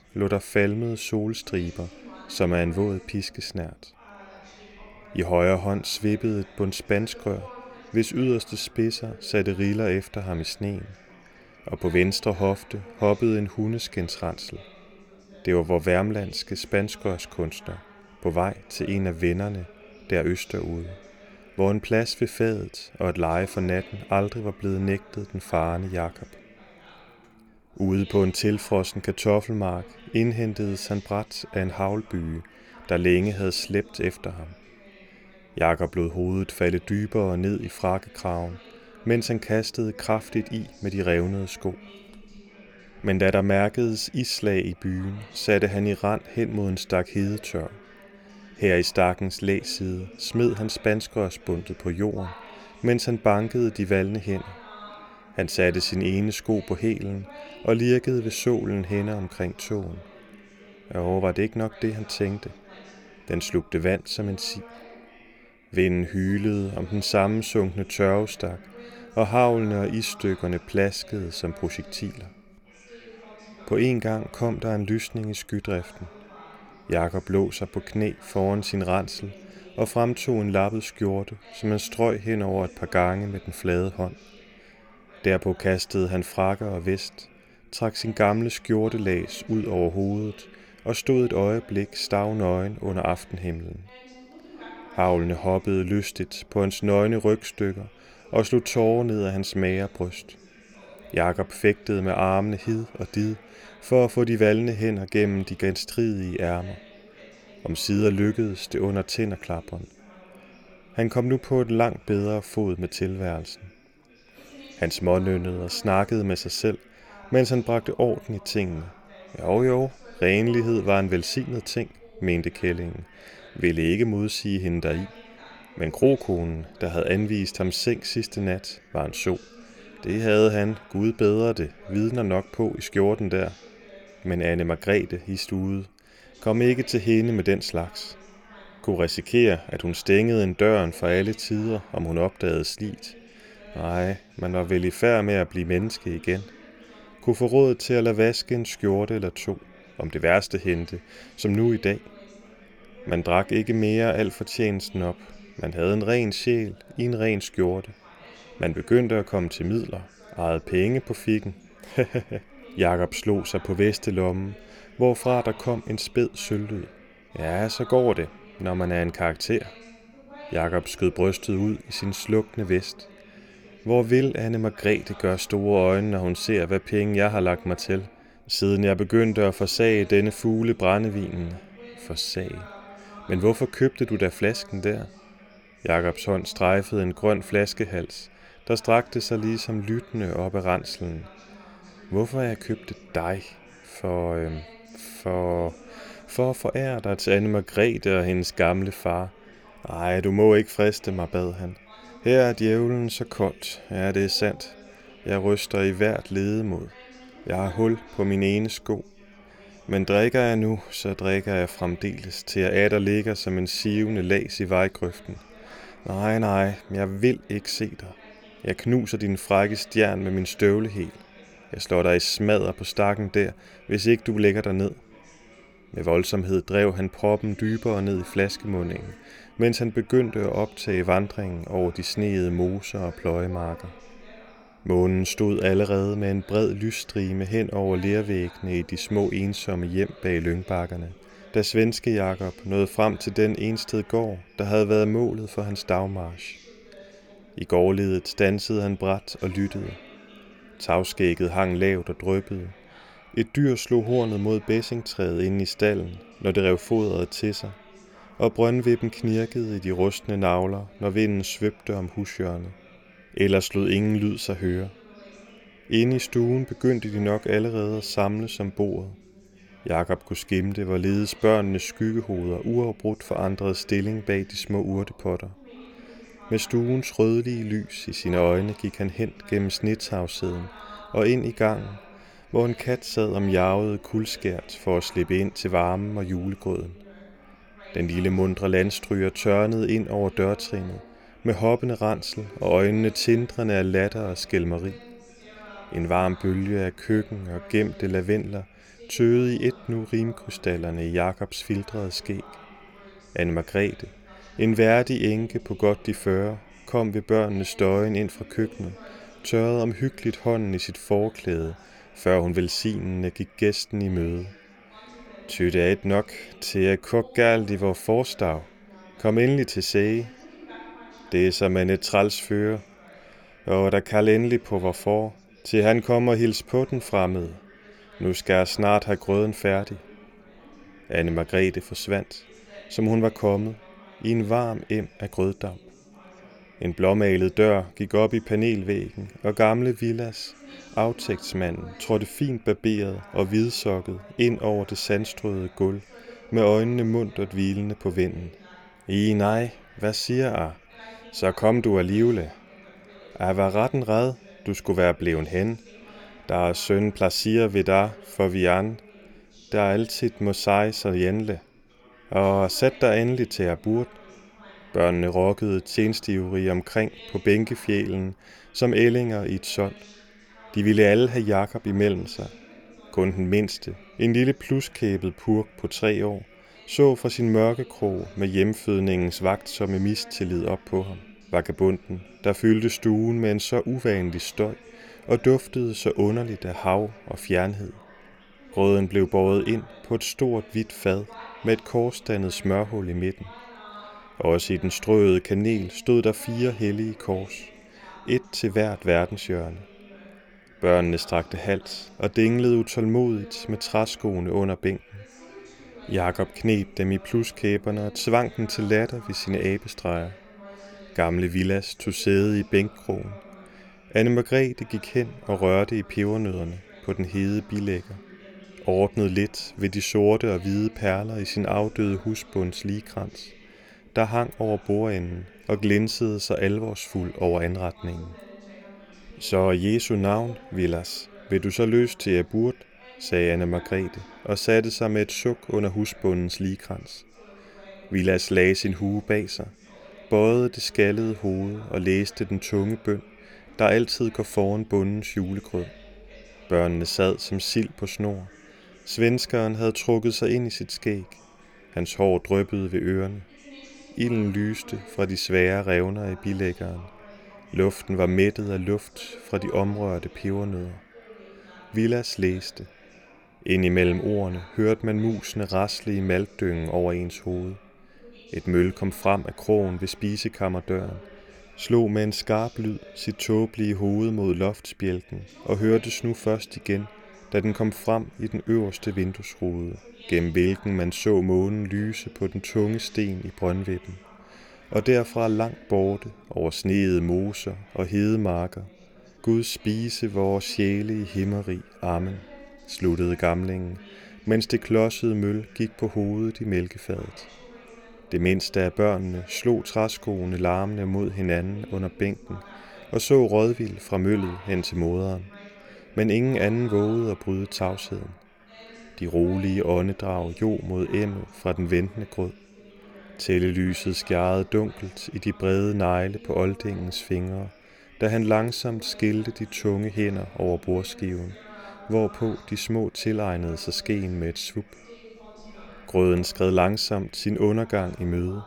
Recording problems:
background chatter; faint; throughout; 4 voices, 25 dB below the speech

